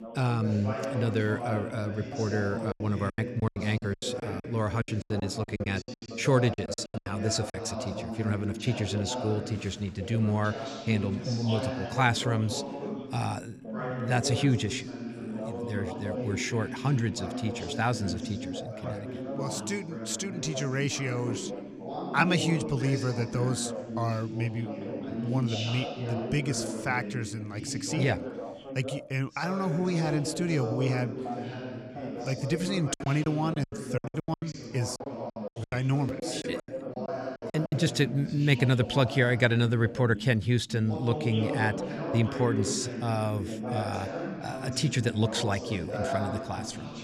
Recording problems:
background chatter; loud; throughout; 2 voices, 6 dB below the speech
choppy; very; from 2.5 to 7.5 s and from 33 to 38 s; 23% of the speech affected

